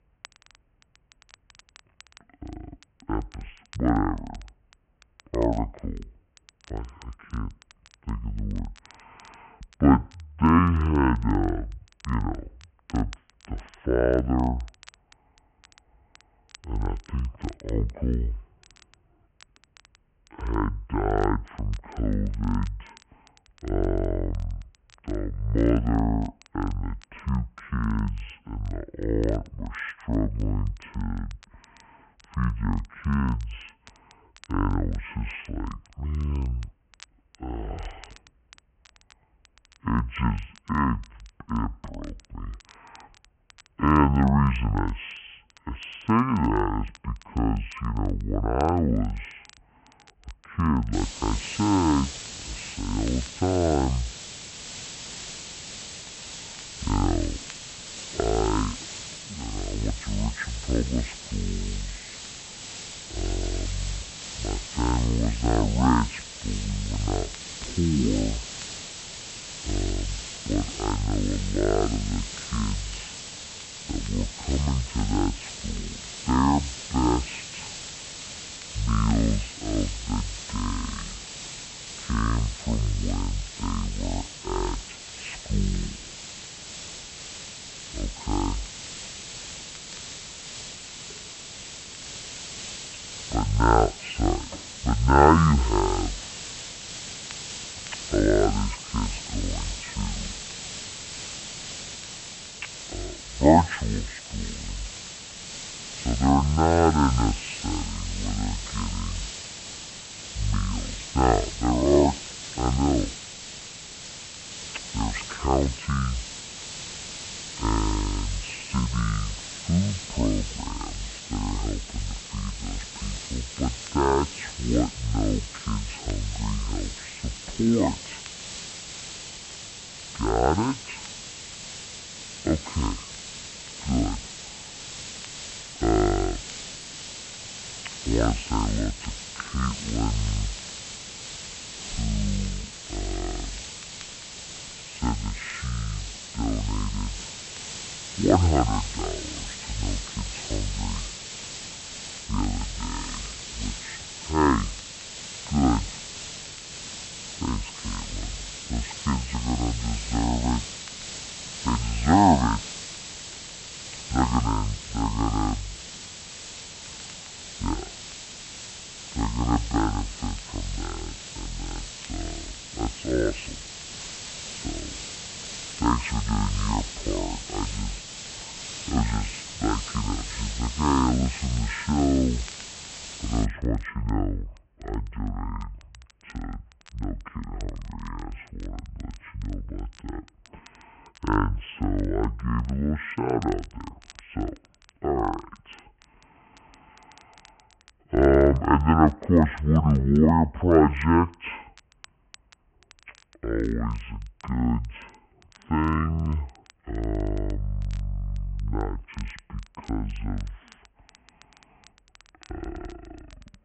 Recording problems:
high frequencies cut off; severe; nothing above 3 kHz
wrong speed and pitch; too slow and too low; 0.5 times normal speed
hiss; loud; from 51 s to 3:03; 9 dB below the speech
crackle, like an old record; faint; 30 dB below the speech

